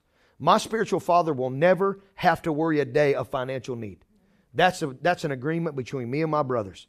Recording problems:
none

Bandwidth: 14.5 kHz